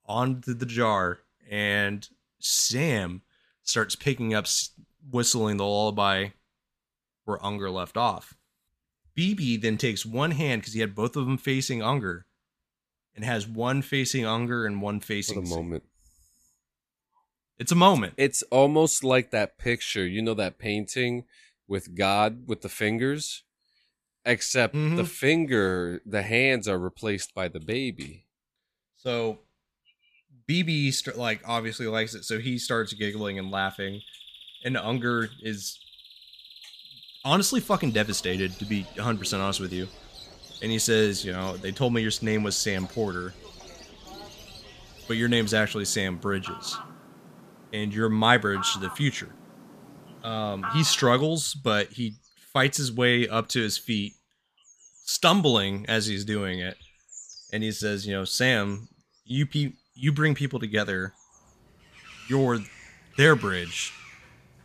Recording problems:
animal sounds; noticeable; from 31 s on; 20 dB below the speech

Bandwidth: 14.5 kHz